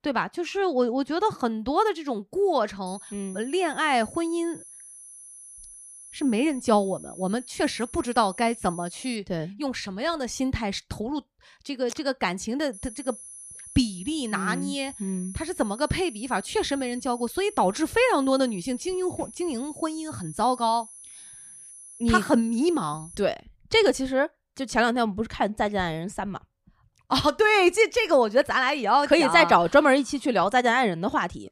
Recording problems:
high-pitched whine; noticeable; from 3 to 9 s and from 13 to 23 s; 11 kHz, 15 dB below the speech

